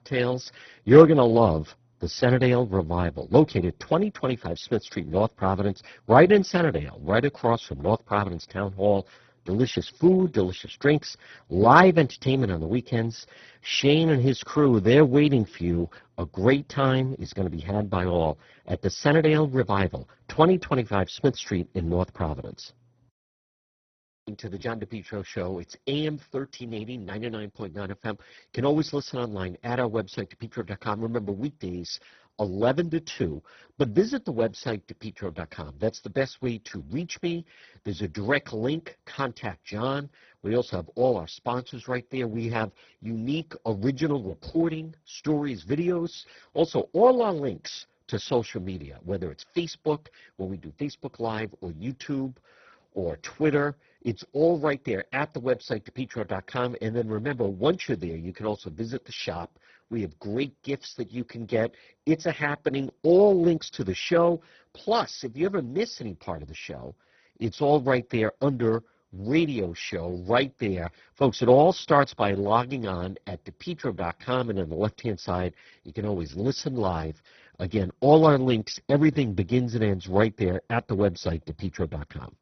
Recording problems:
garbled, watery; badly; nothing above 6 kHz

